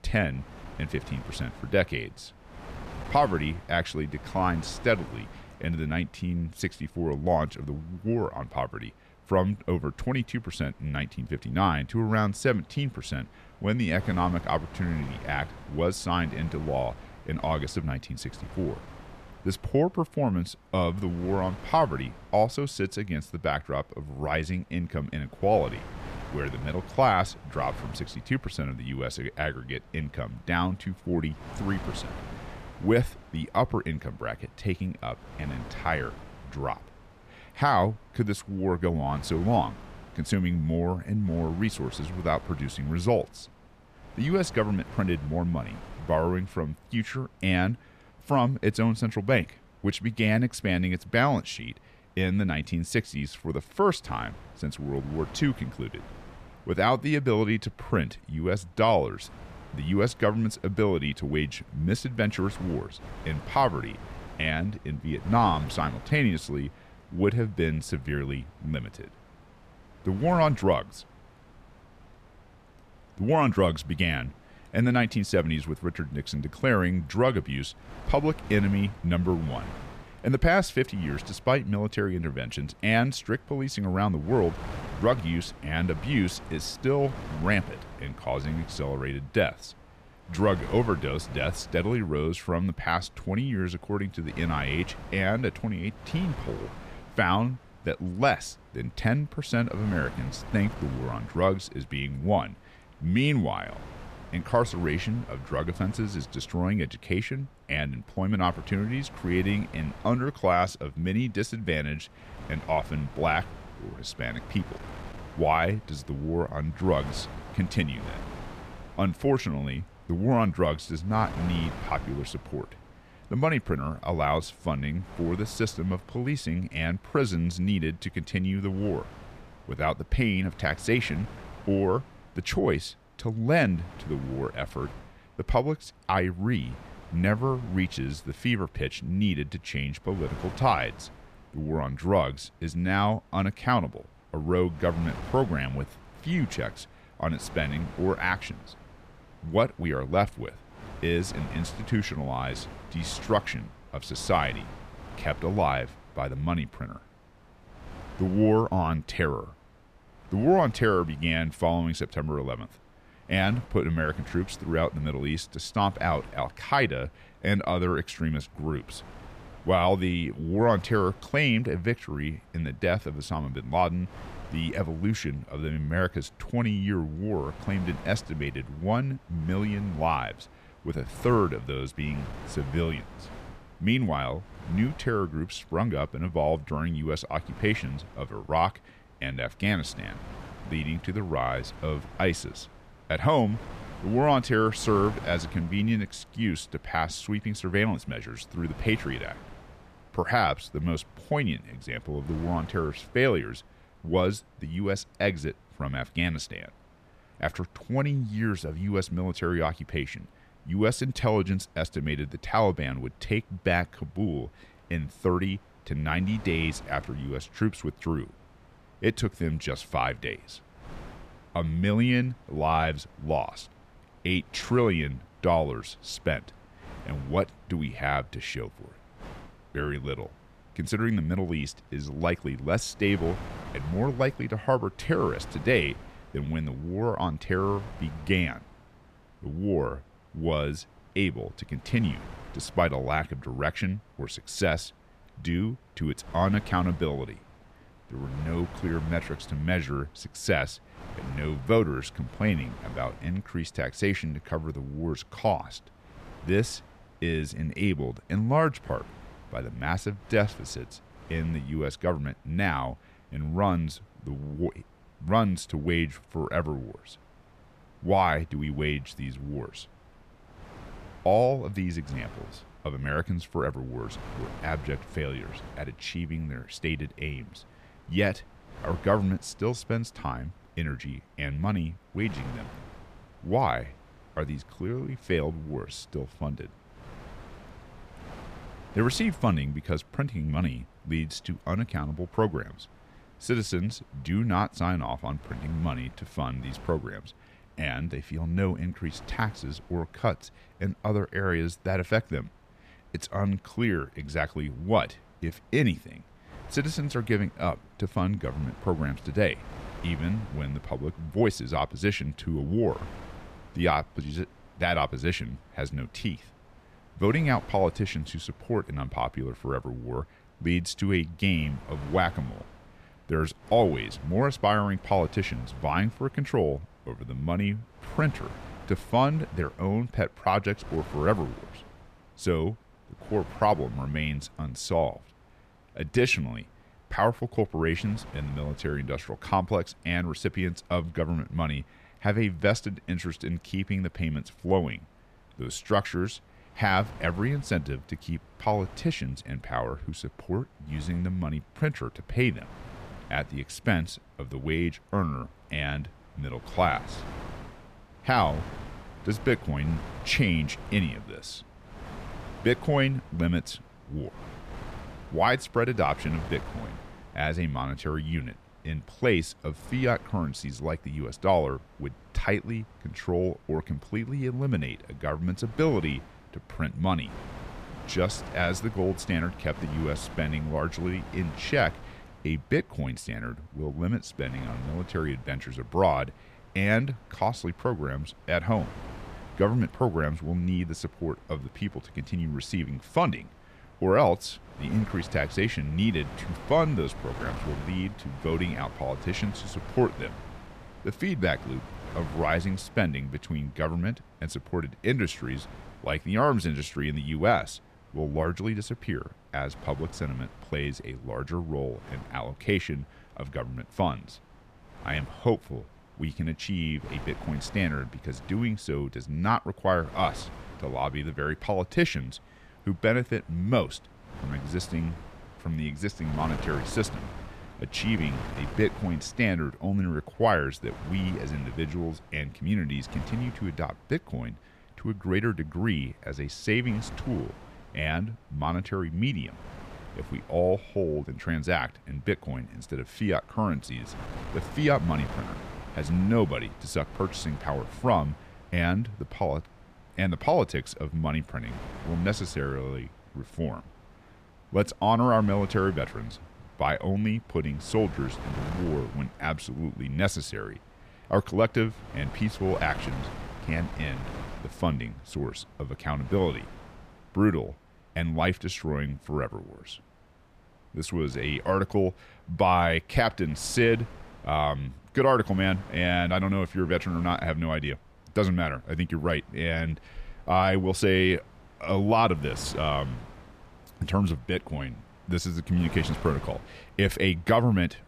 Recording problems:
wind noise on the microphone; occasional gusts; 20 dB below the speech

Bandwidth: 14.5 kHz